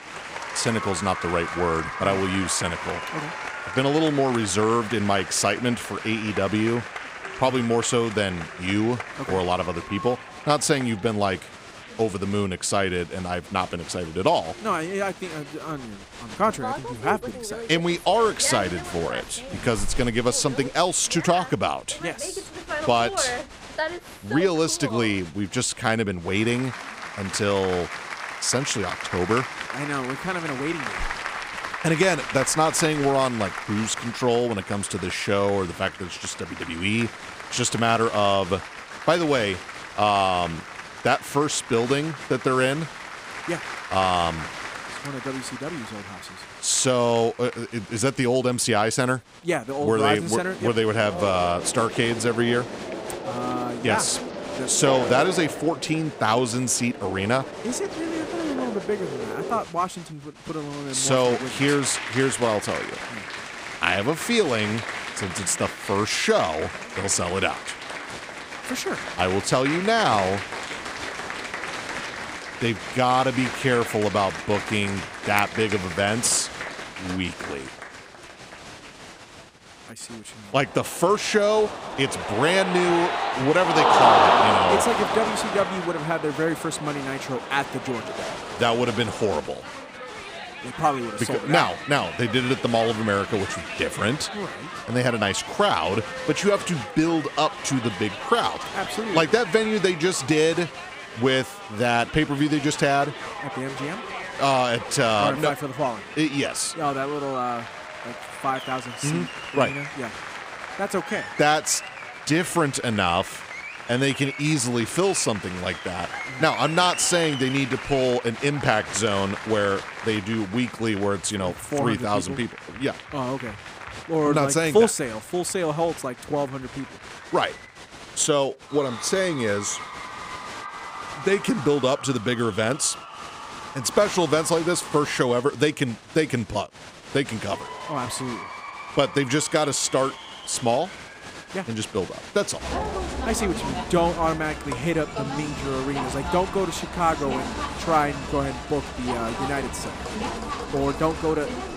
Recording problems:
crowd noise; loud; throughout; 8 dB below the speech

